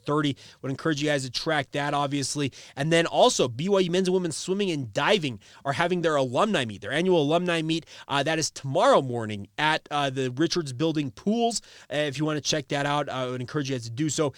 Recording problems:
none

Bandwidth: 18.5 kHz